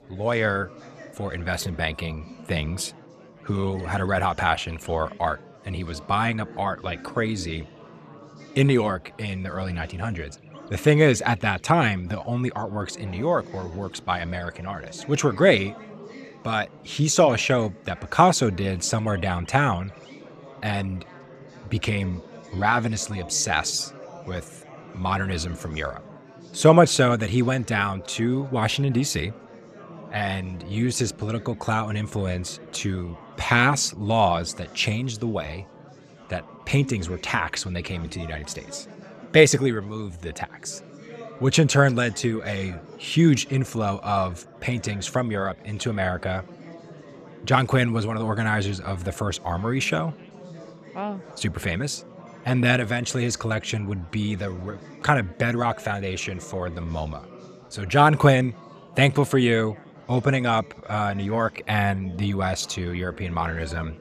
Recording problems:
animal sounds; faint; throughout; 30 dB below the speech
chatter from many people; faint; throughout; 20 dB below the speech

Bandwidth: 14.5 kHz